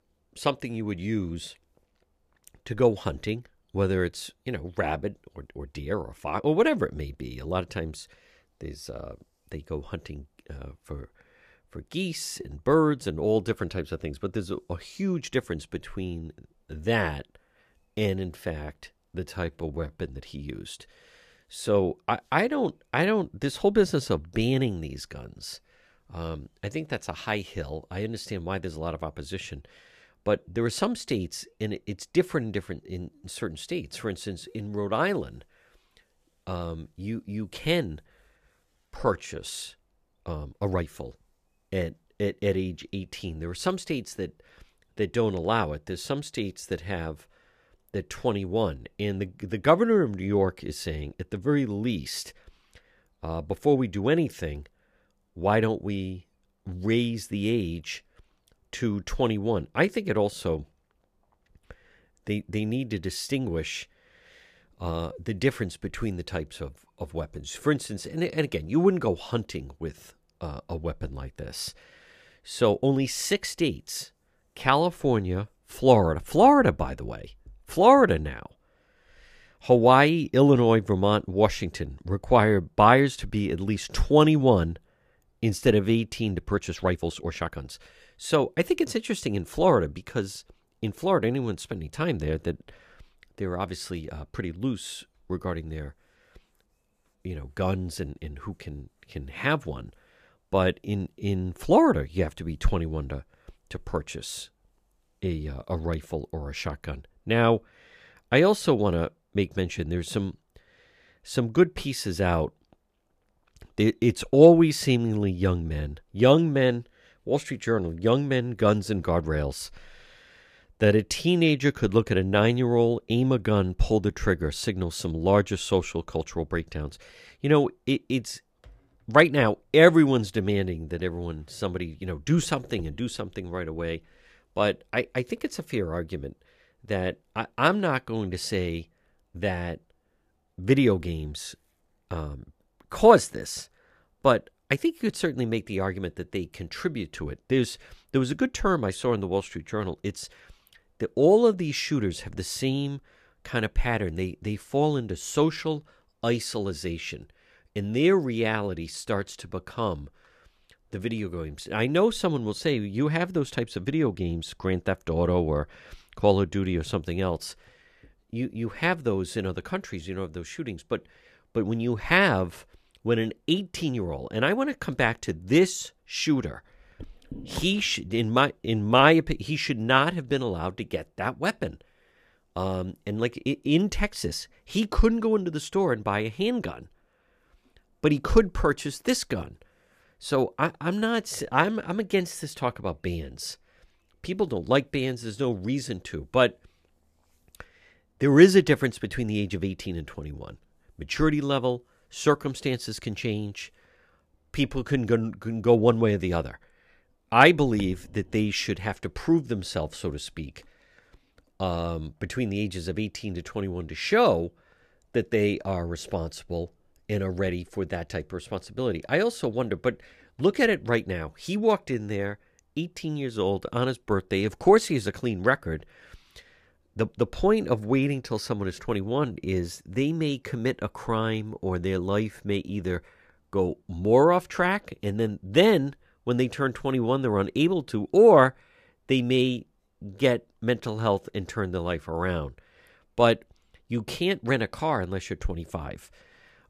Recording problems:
uneven, jittery; strongly; from 5.5 s to 3:50

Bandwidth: 14.5 kHz